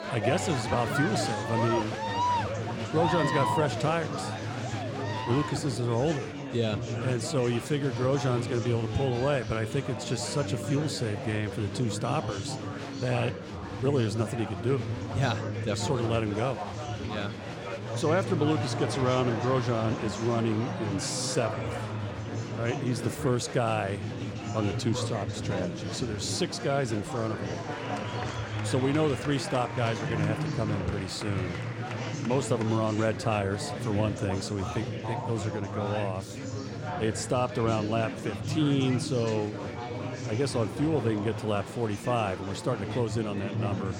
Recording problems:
chatter from many people; loud; throughout; 4 dB below the speech

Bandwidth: 17 kHz